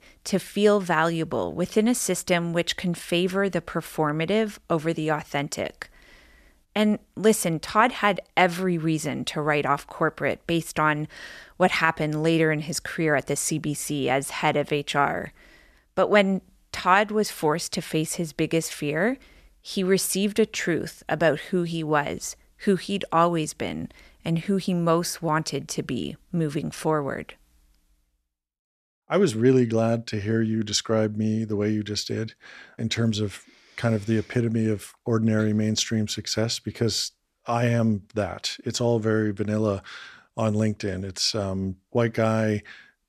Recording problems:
none

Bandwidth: 14 kHz